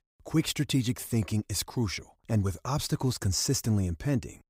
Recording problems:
none

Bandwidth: 15.5 kHz